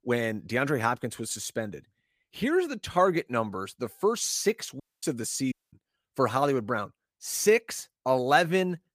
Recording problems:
audio cutting out; at 5 s and at 5.5 s

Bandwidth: 15 kHz